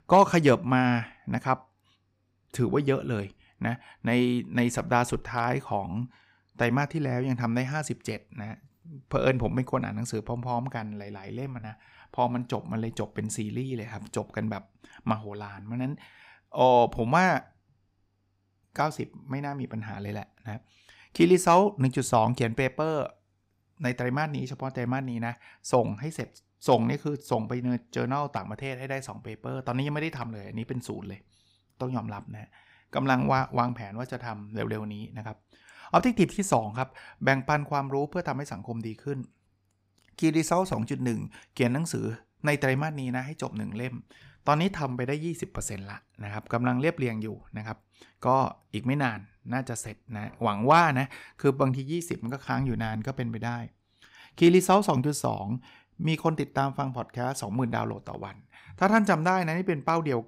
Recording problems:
none

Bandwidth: 15.5 kHz